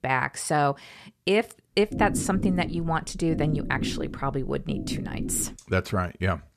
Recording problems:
low rumble; noticeable; from 2 to 5.5 s; 10 dB below the speech

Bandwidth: 14 kHz